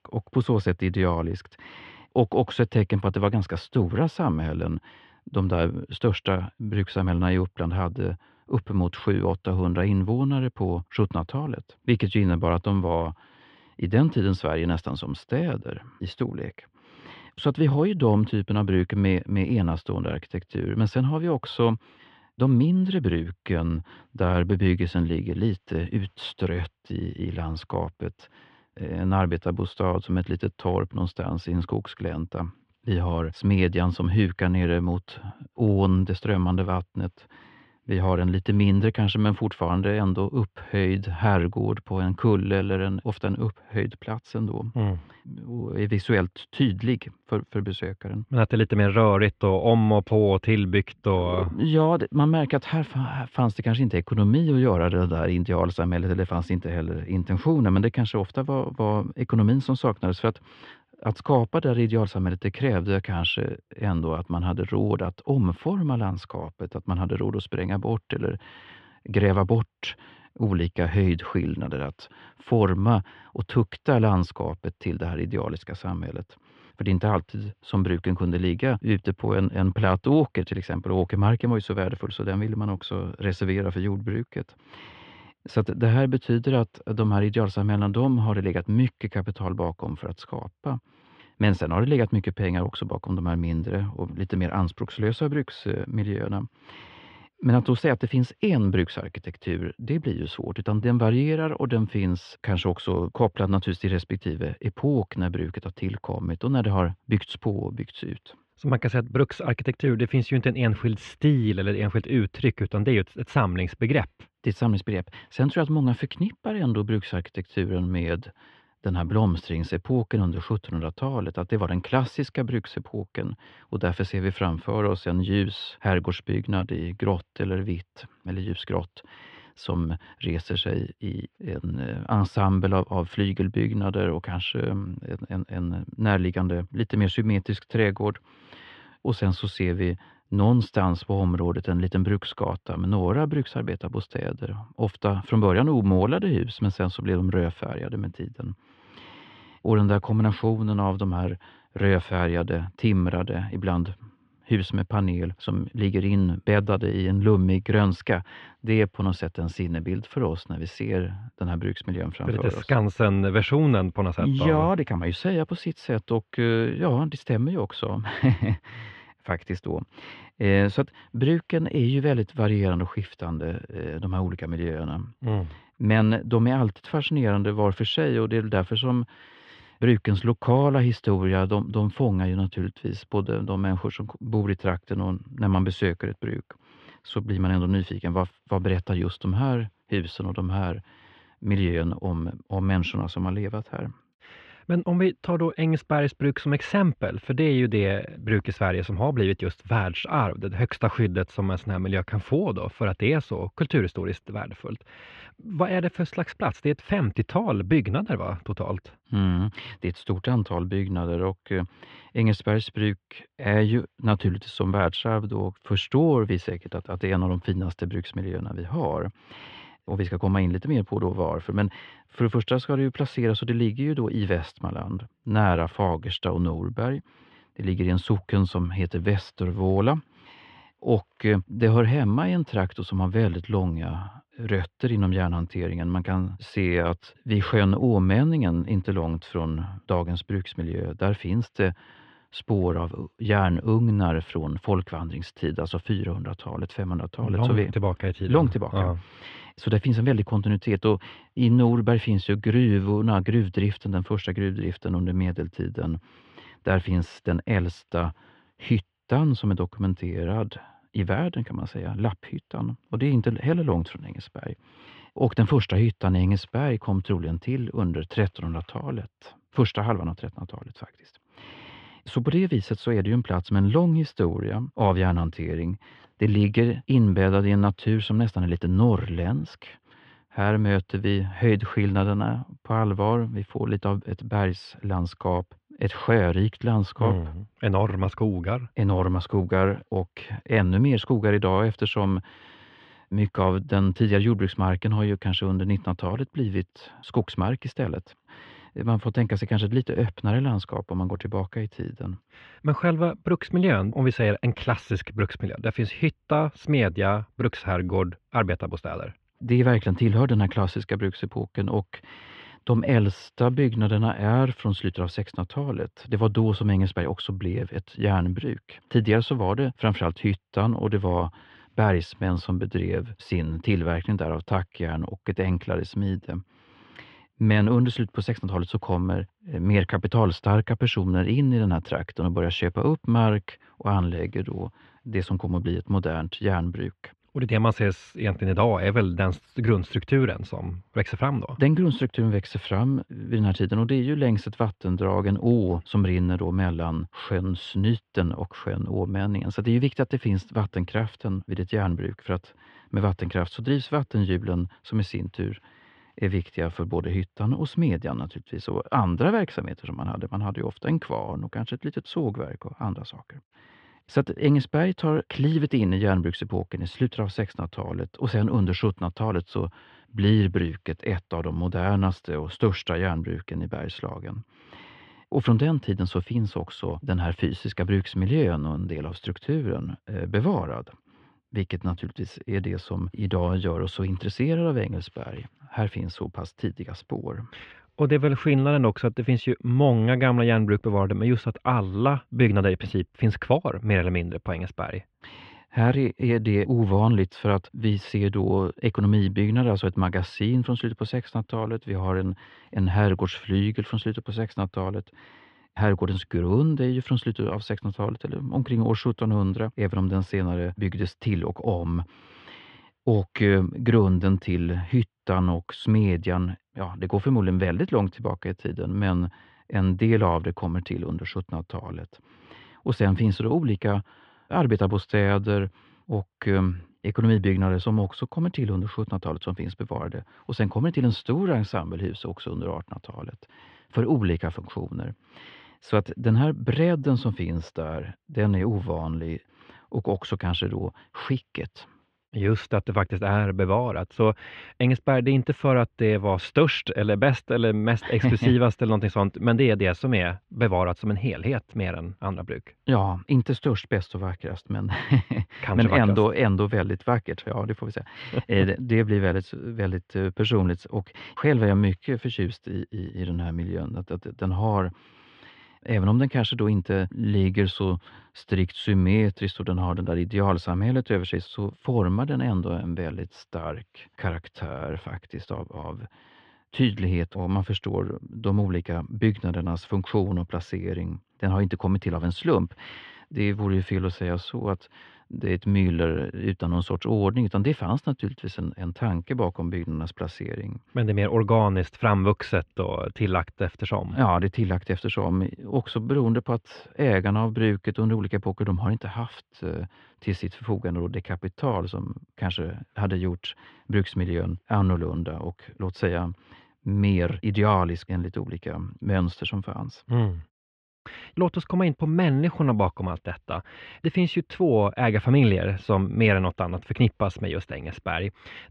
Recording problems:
muffled; very; fading above 3 kHz

